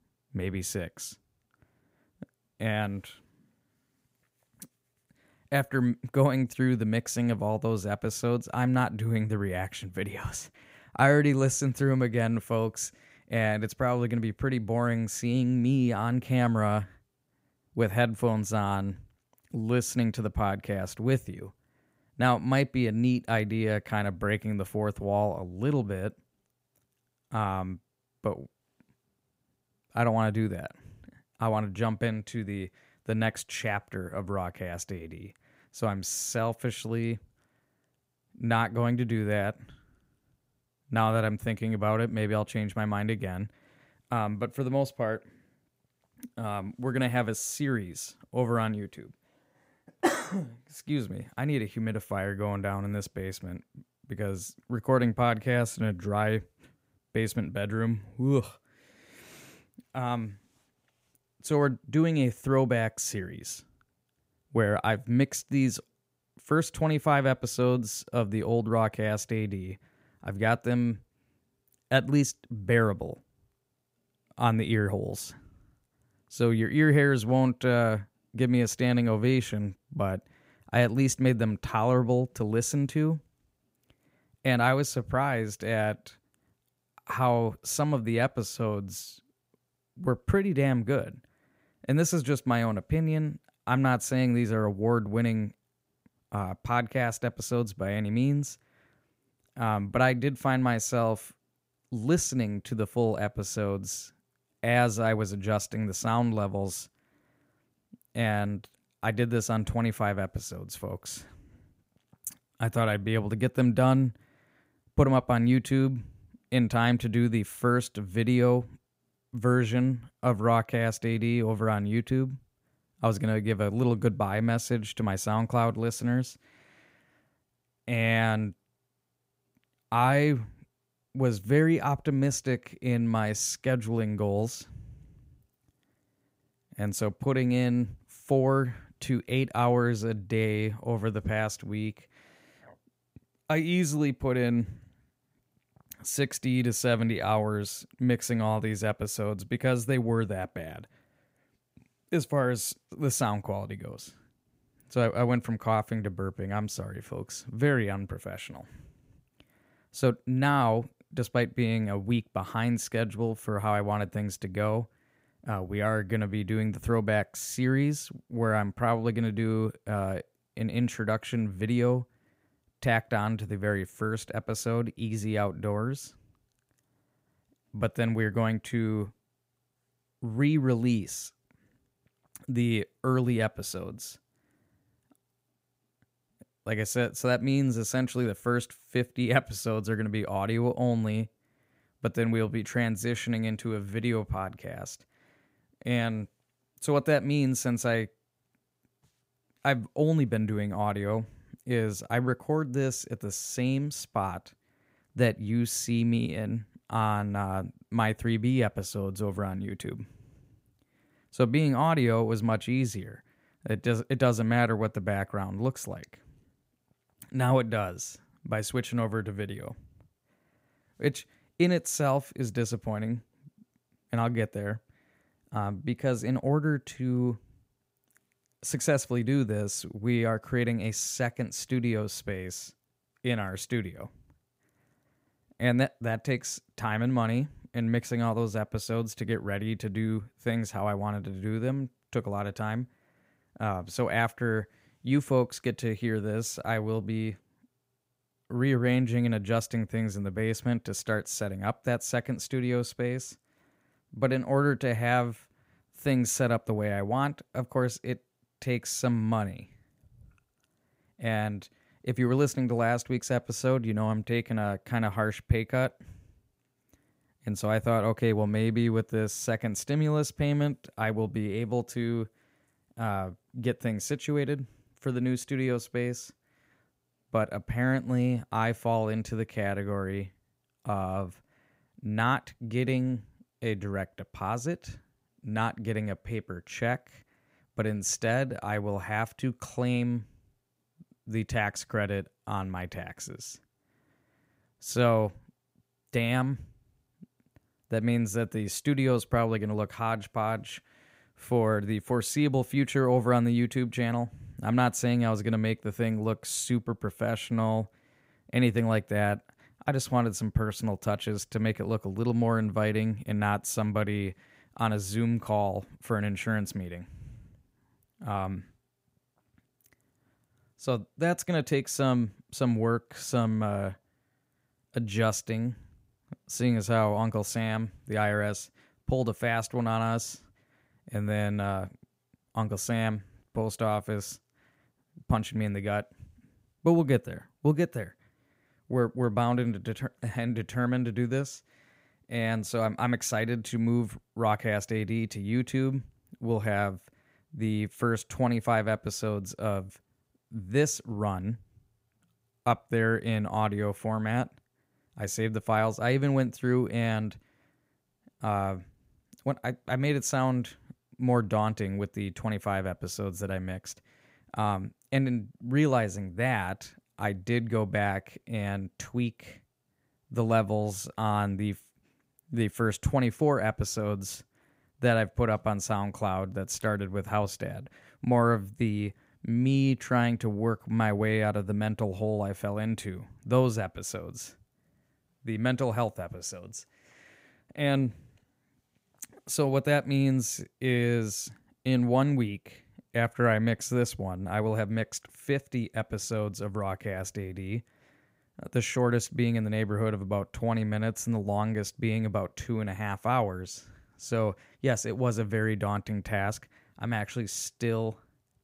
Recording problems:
none

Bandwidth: 15.5 kHz